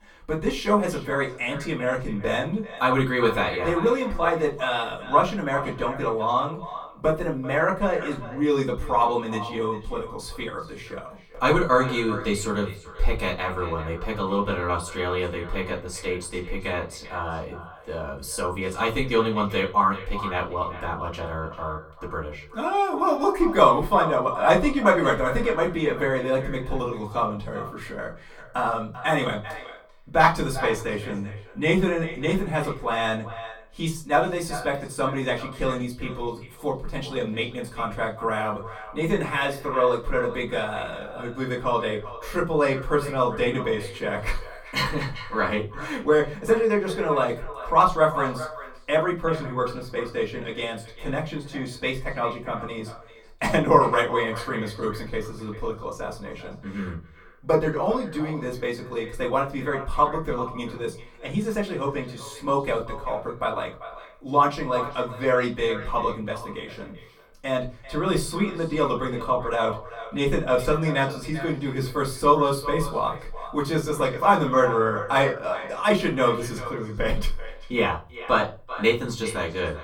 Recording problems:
off-mic speech; far
echo of what is said; noticeable; throughout; 390 ms later, 15 dB below the speech
room echo; very slight; dies away in 0.3 s

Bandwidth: 18 kHz